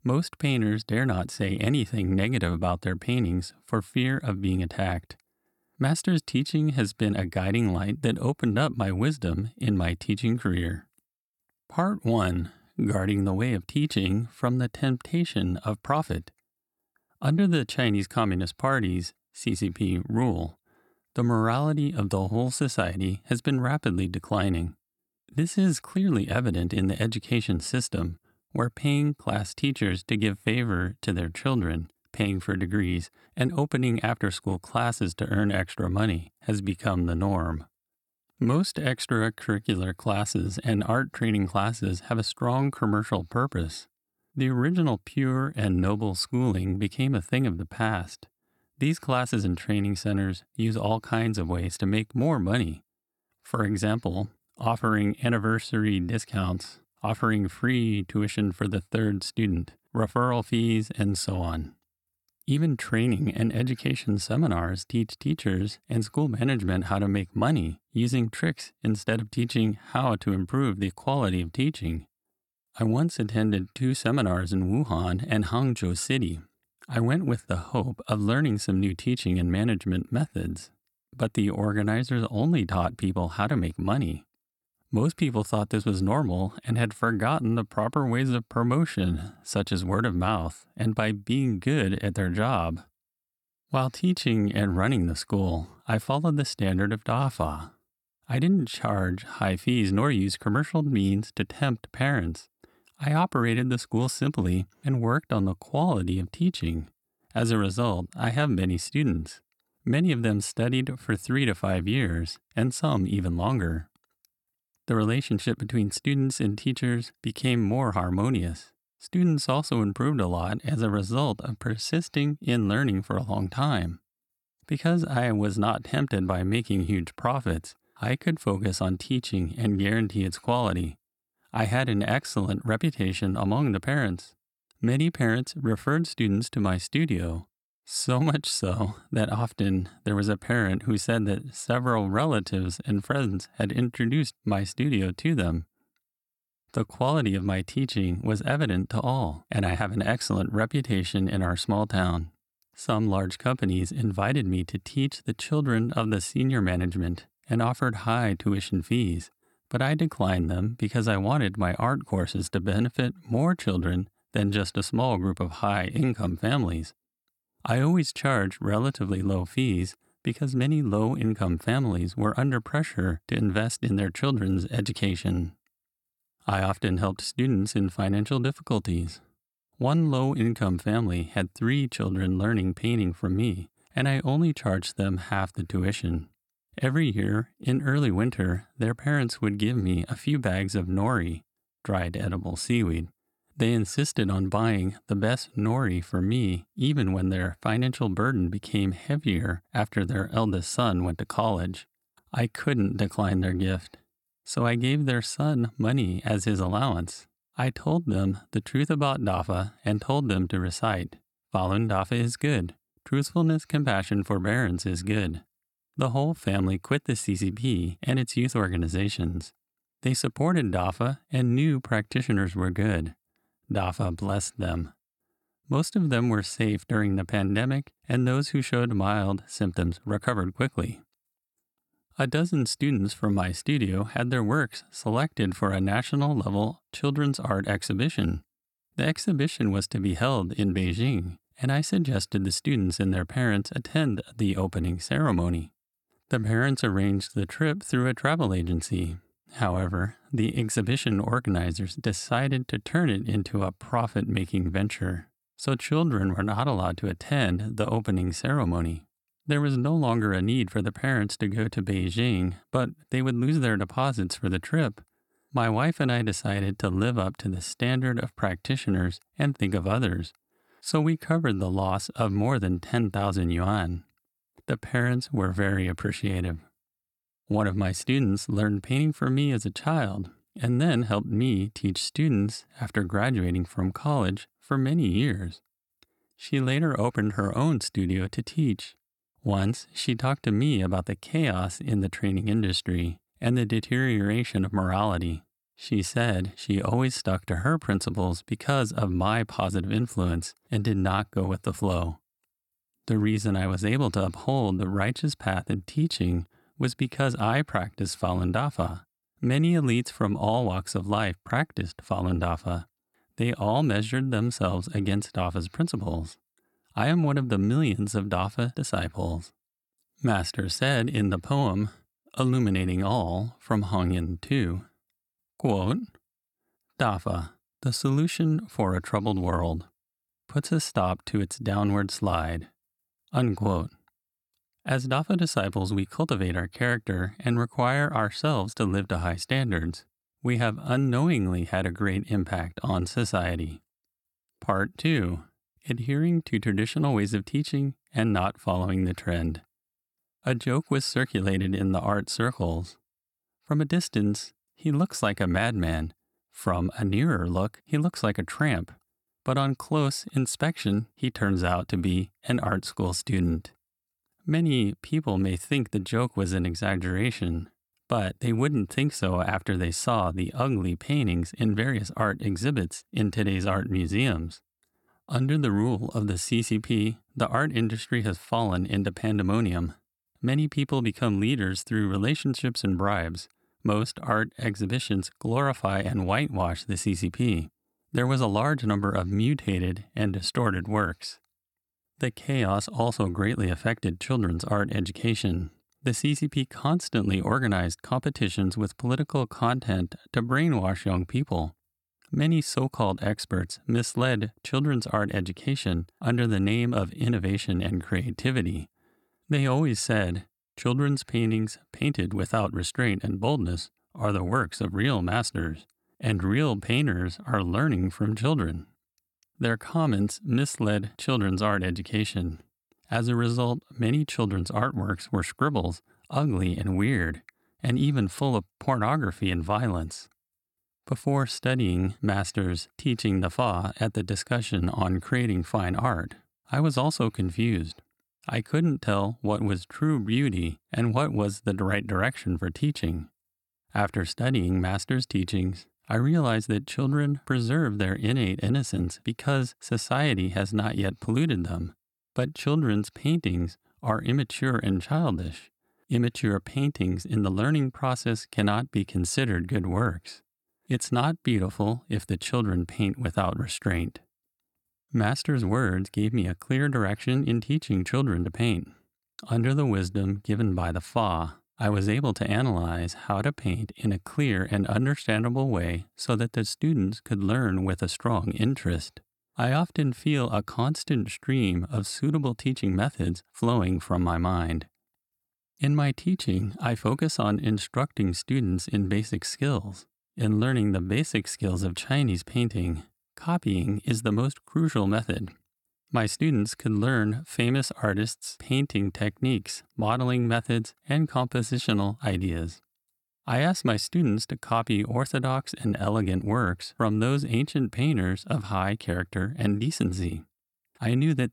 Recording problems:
none

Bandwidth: 18.5 kHz